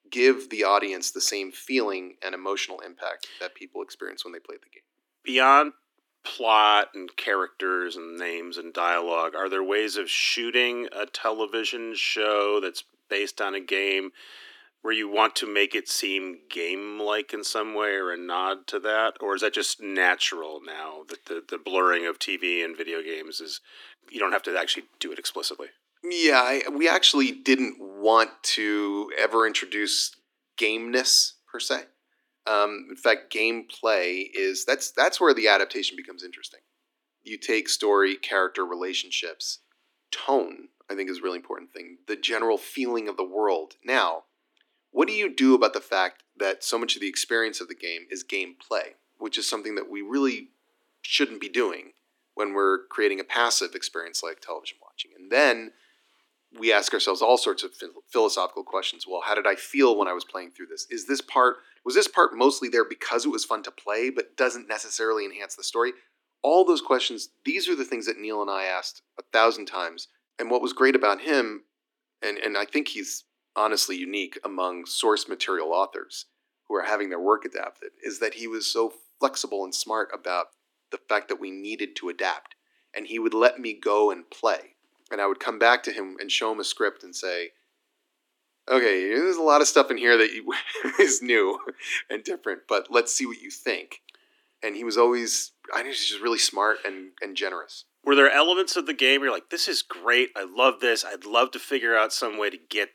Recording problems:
thin; somewhat; fading below 250 Hz

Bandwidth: 18.5 kHz